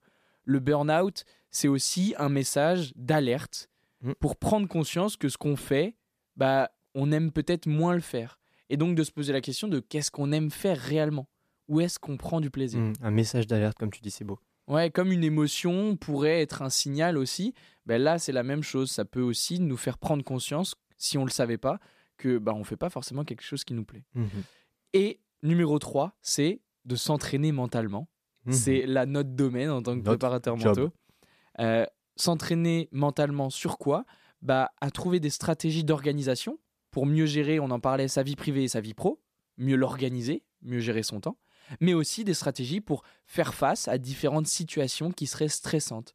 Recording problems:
none

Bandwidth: 14.5 kHz